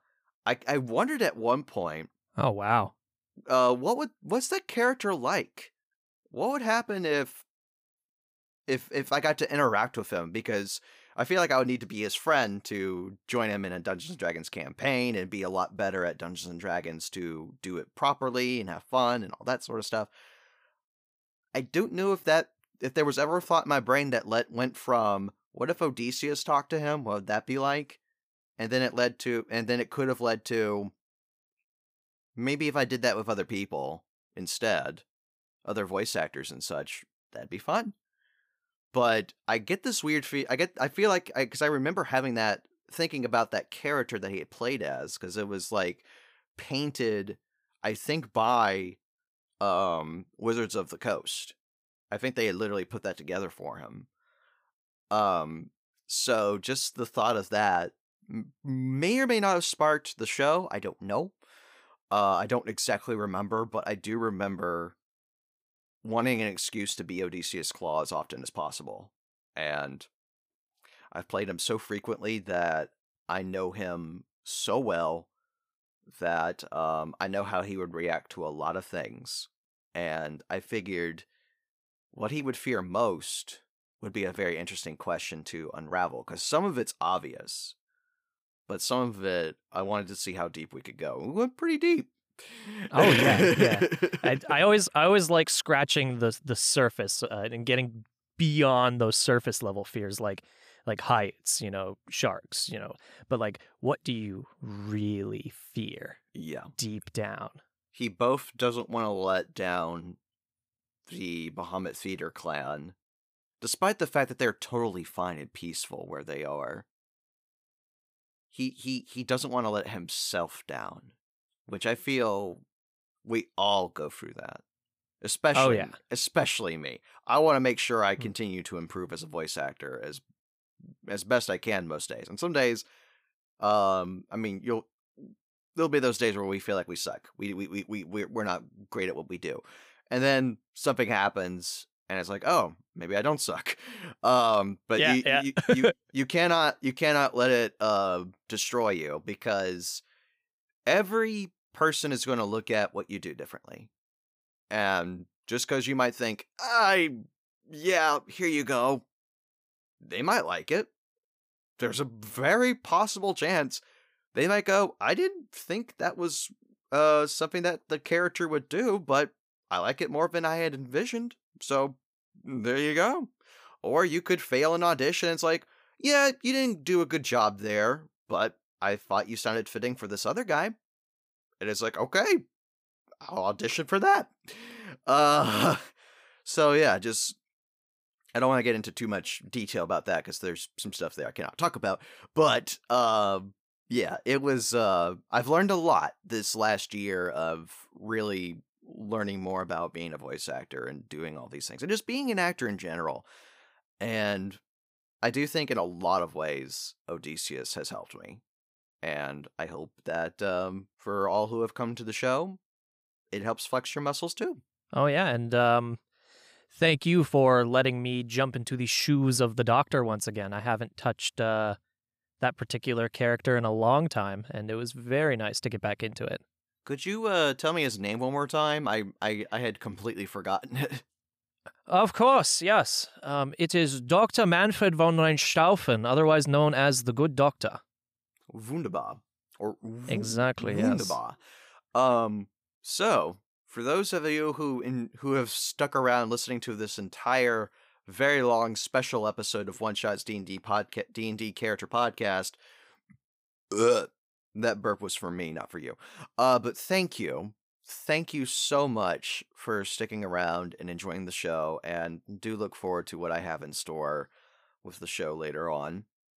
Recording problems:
none

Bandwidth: 15 kHz